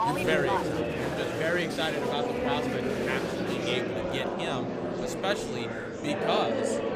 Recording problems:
murmuring crowd; very loud; throughout; 2 dB above the speech

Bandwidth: 15 kHz